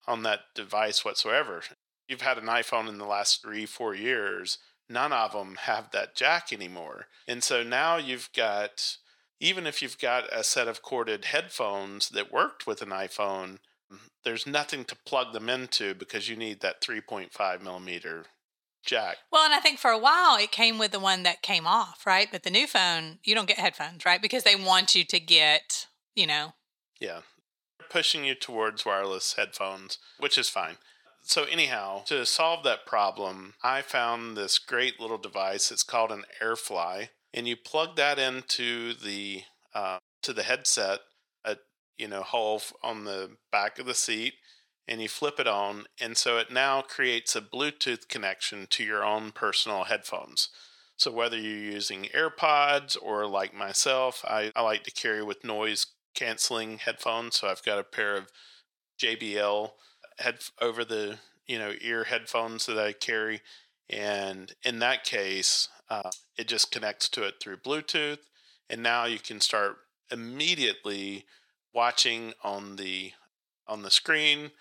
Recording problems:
thin; very; fading below 650 Hz

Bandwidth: 17 kHz